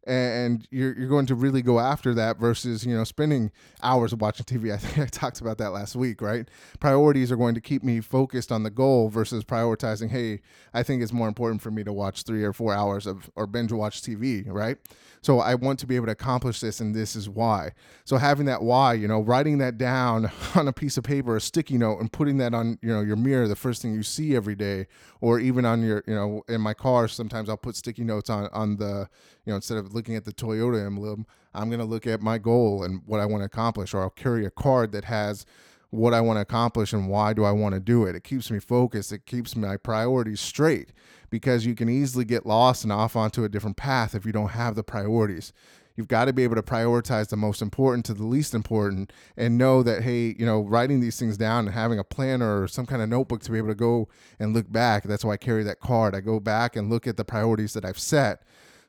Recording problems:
none

